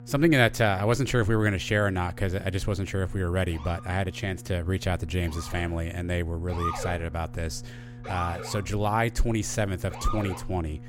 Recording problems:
electrical hum; faint; throughout; 60 Hz, 25 dB below the speech
siren; noticeable; from 3.5 s on; peak 4 dB below the speech

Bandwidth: 16 kHz